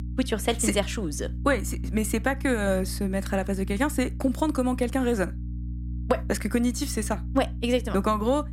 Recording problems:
electrical hum; faint; throughout; 60 Hz, 20 dB below the speech

